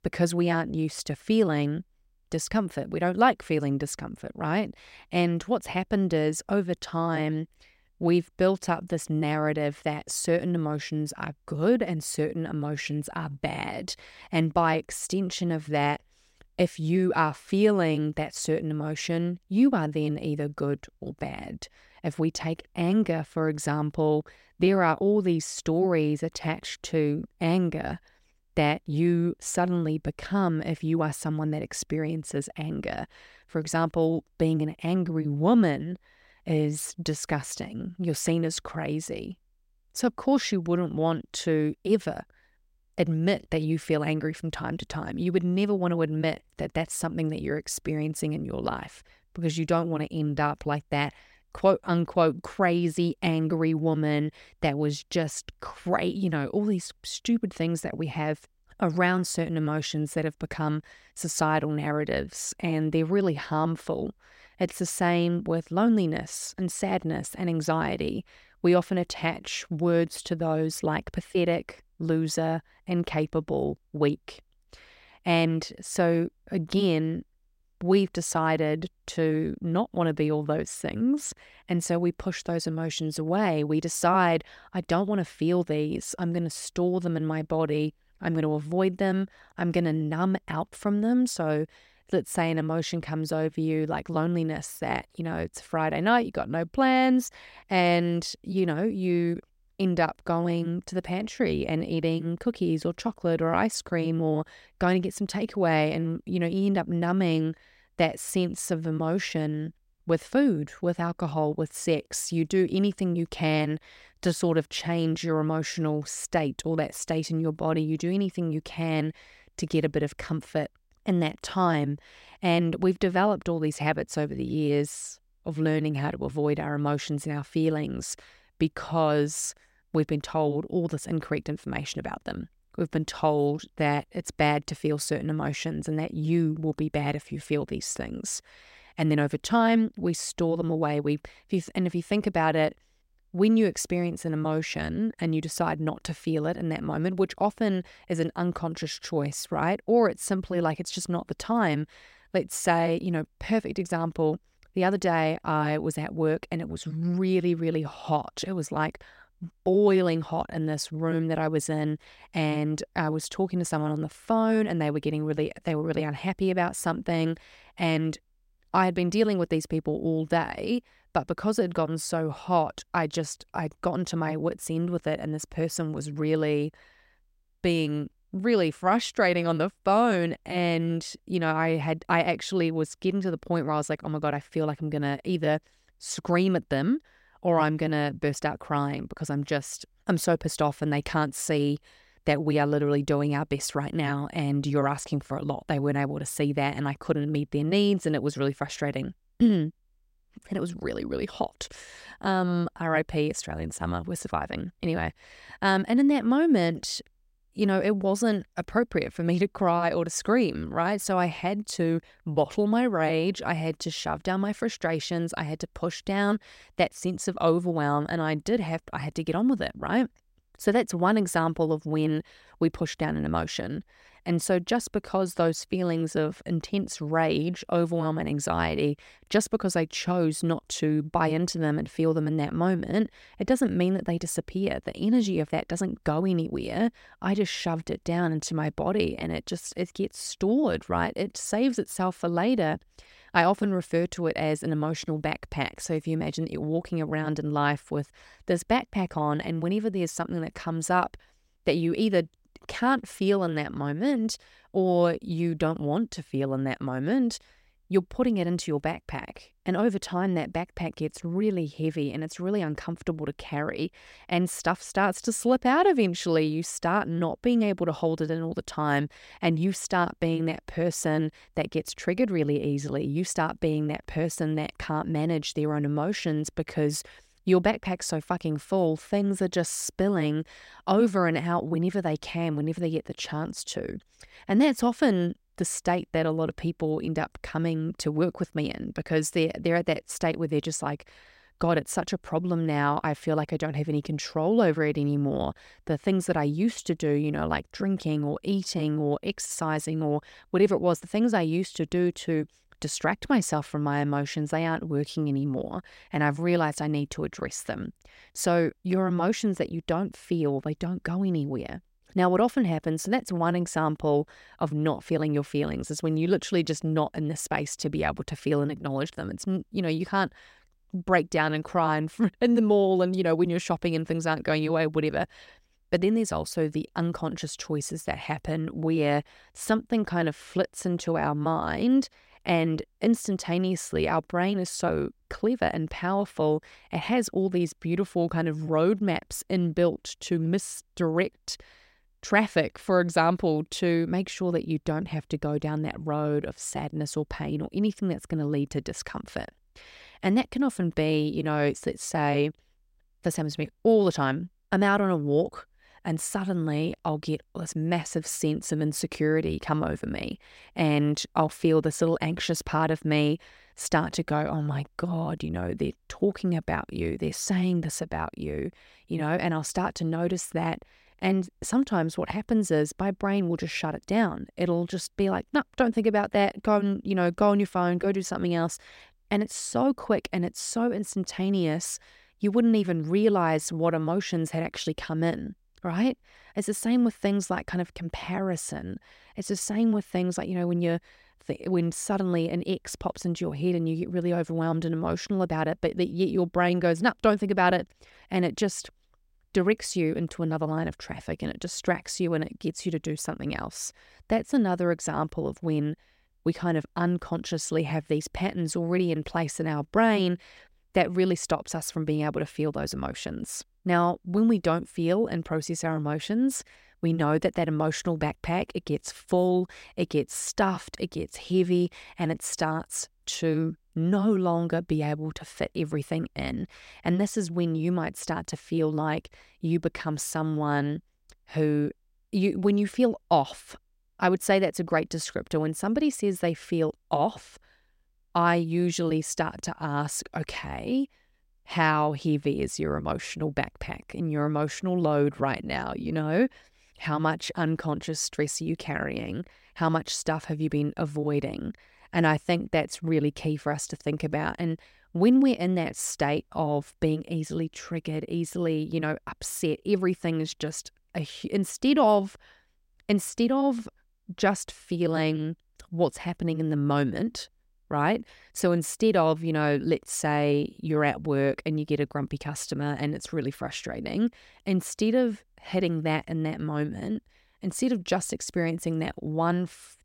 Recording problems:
none

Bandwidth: 16 kHz